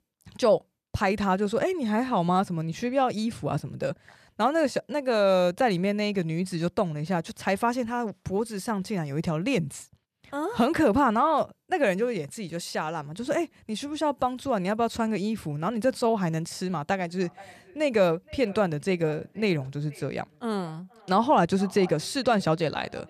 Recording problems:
echo of what is said; faint; from 17 s on; 470 ms later, 20 dB below the speech

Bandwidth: 13.5 kHz